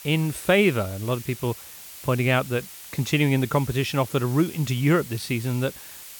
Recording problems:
hiss; noticeable; throughout; 15 dB below the speech

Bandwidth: 18.5 kHz